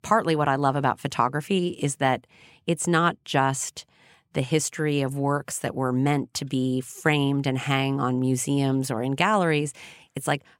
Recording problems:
none

